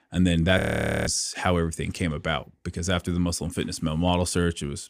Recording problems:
audio freezing; at 0.5 s

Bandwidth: 15 kHz